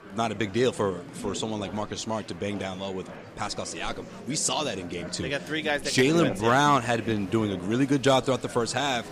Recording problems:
murmuring crowd; noticeable; throughout; 15 dB below the speech

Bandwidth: 15 kHz